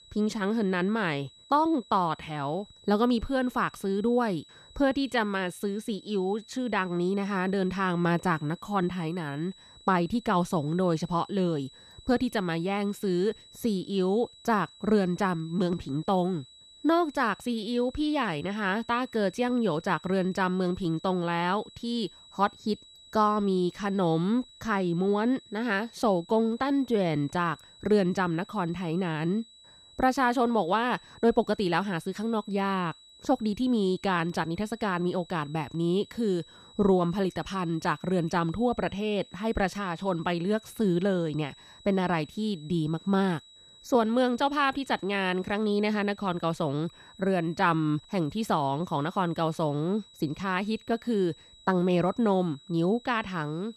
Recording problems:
high-pitched whine; faint; throughout; 4 kHz, 25 dB below the speech

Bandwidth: 13.5 kHz